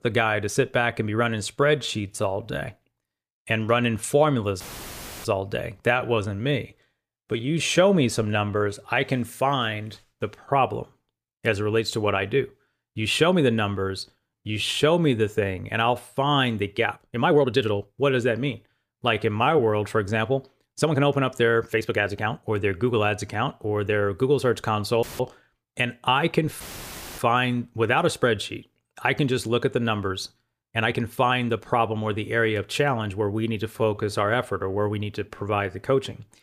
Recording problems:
uneven, jittery; strongly; from 1.5 to 36 s
audio cutting out; filled with static; at 4.5 s for 0.5 s, at 25 s and at 27 s for 0.5 s

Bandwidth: 15 kHz